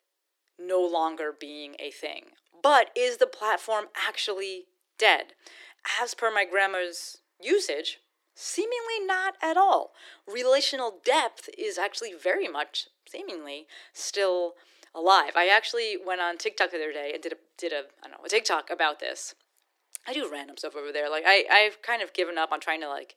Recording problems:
thin; very; fading below 350 Hz

